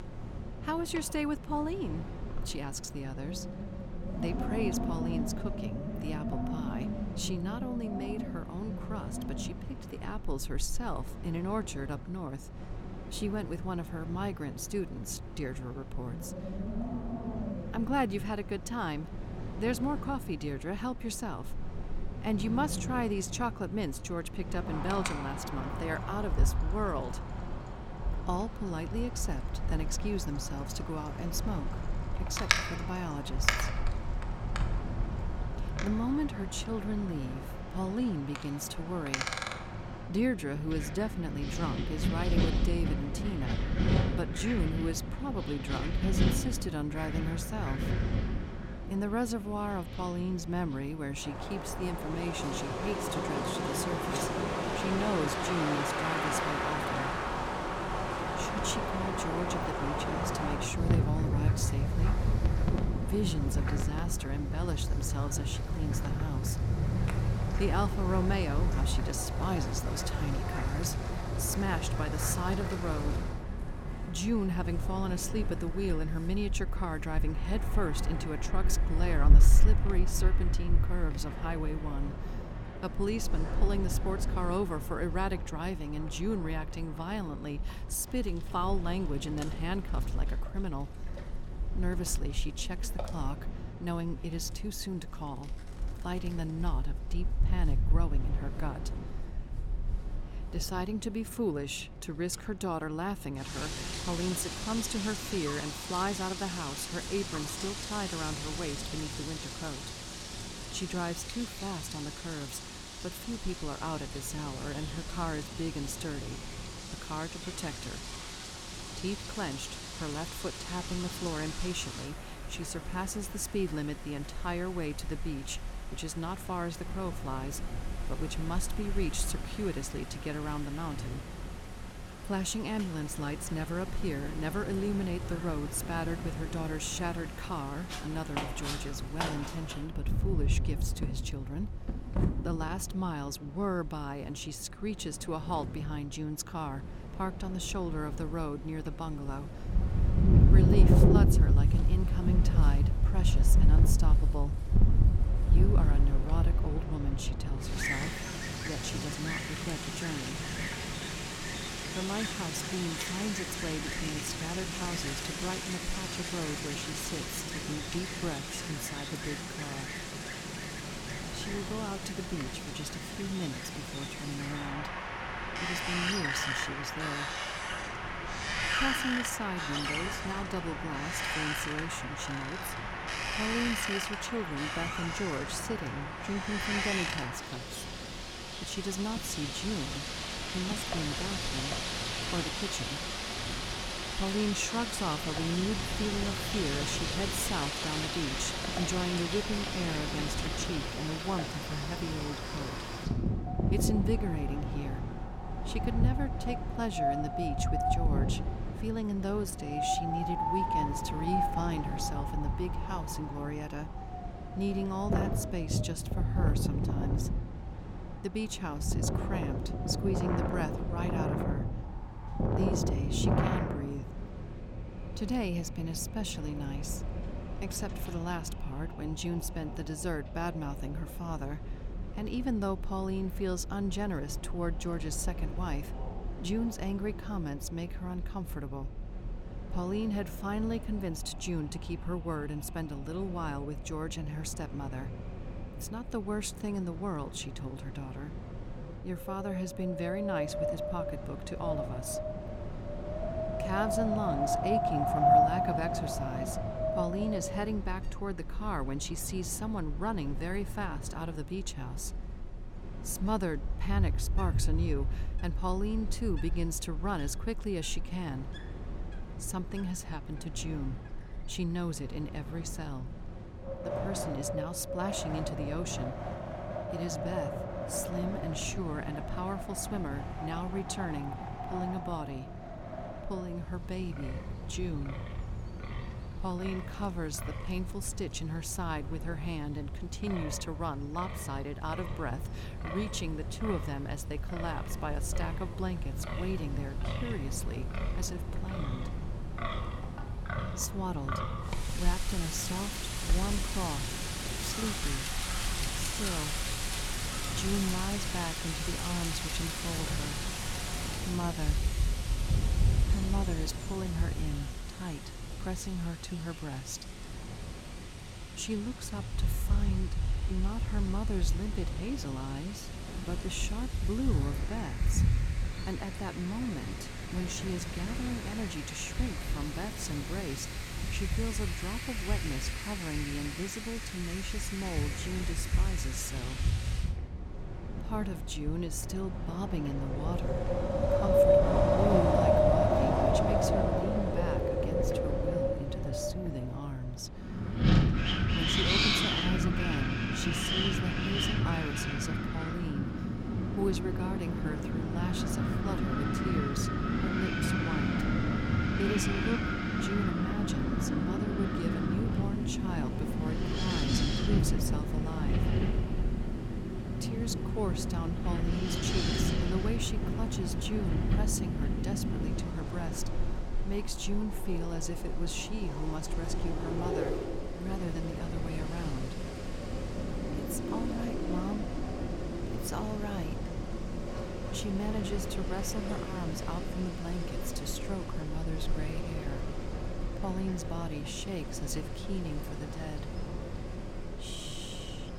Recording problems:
wind in the background; very loud; throughout; 3 dB above the speech

